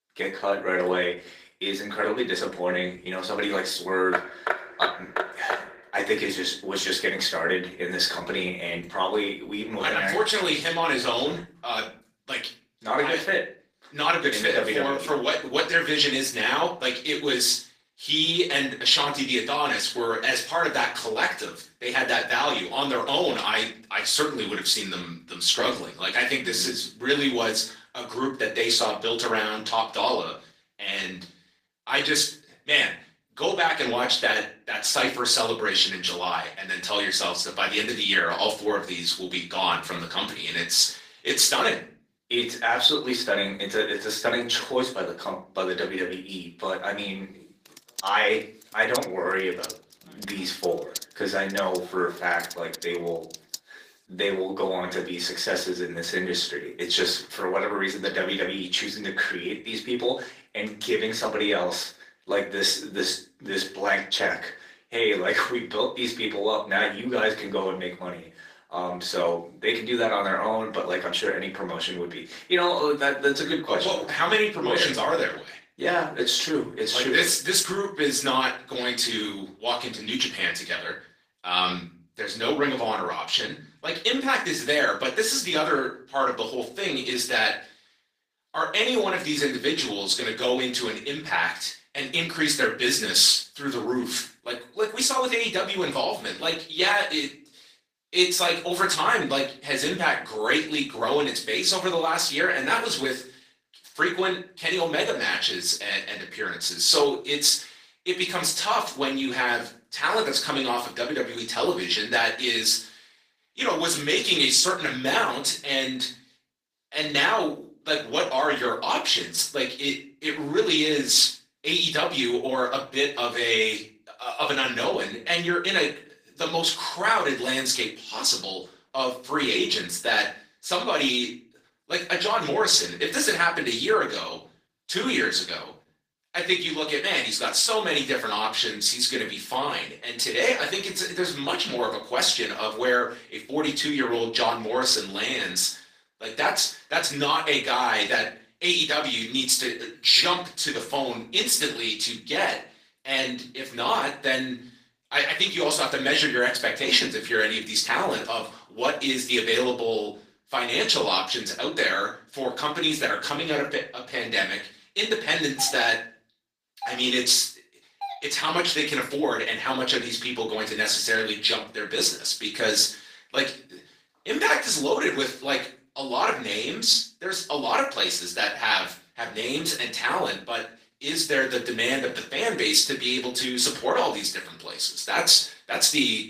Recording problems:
off-mic speech; far
thin; somewhat; fading below 300 Hz
room echo; slight; dies away in 0.3 s
garbled, watery; slightly; nothing above 15 kHz
door banging; noticeable; from 4 to 5.5 s; peak 2 dB below the speech
keyboard typing; noticeable; from 48 to 54 s; peak 9 dB below the speech
doorbell; faint; from 2:46 to 2:48; peak 10 dB below the speech

